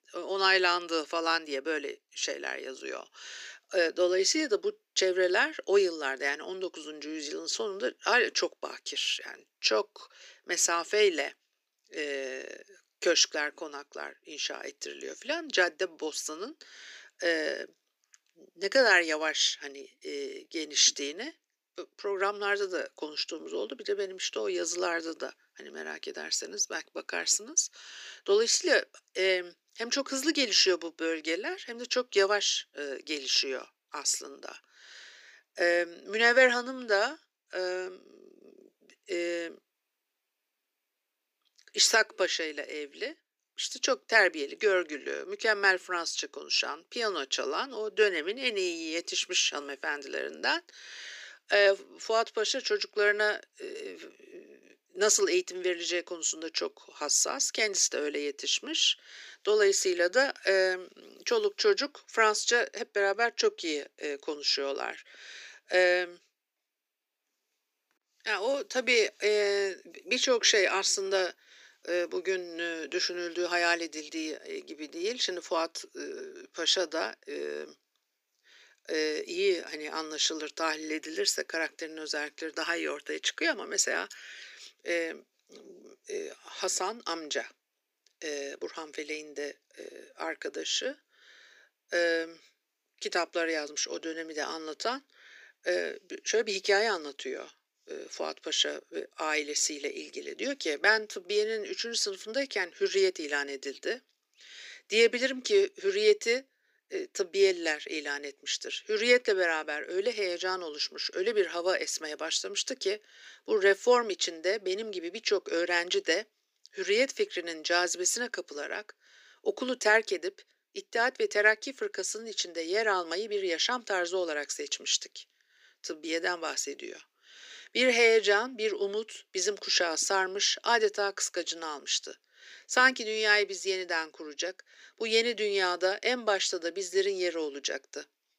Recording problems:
thin; somewhat; fading below 300 Hz

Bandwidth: 15 kHz